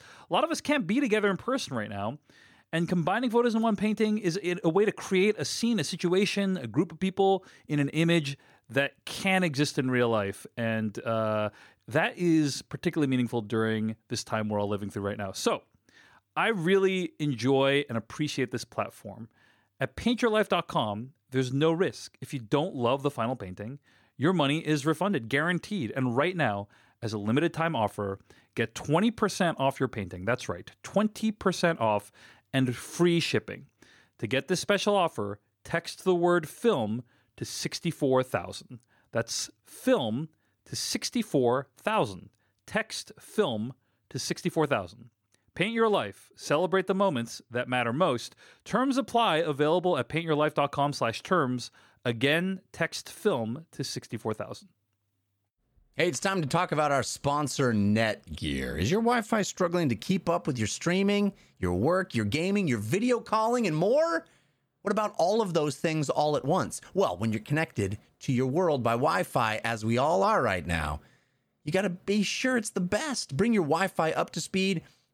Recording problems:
none

